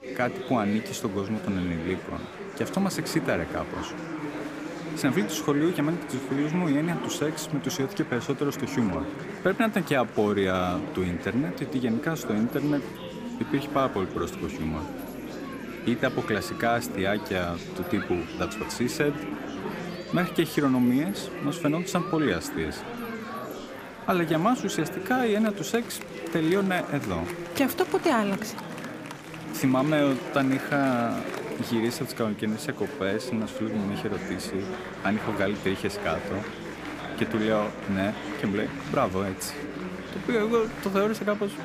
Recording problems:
chatter from many people; loud; throughout; 8 dB below the speech

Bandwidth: 15 kHz